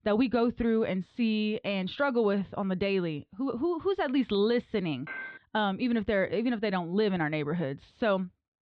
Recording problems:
muffled; slightly; fading above 3.5 kHz
clattering dishes; noticeable; at 5 s; peak 10 dB below the speech

